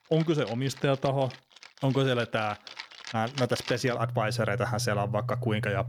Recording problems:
background music; loud; throughout; 9 dB below the speech

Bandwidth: 18.5 kHz